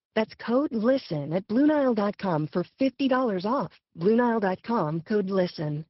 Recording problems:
high frequencies cut off; noticeable; nothing above 5.5 kHz
garbled, watery; slightly

